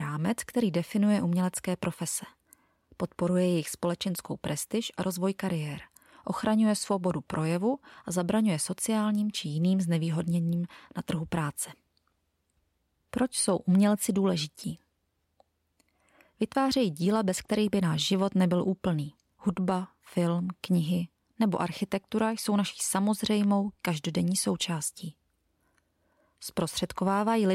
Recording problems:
abrupt cut into speech; at the start and the end

